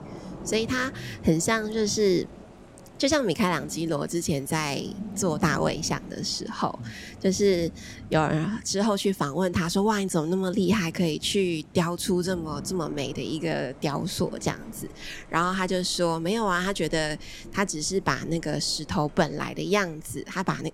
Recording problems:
rain or running water; noticeable; throughout; 15 dB below the speech

